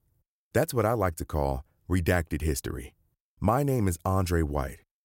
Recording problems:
none

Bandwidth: 16 kHz